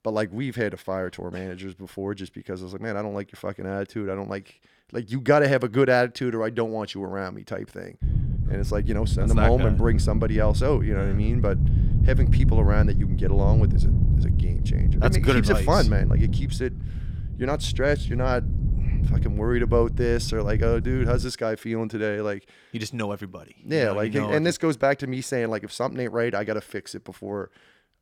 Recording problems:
wind noise on the microphone; occasional gusts; from 8 to 21 s; 10 dB below the speech

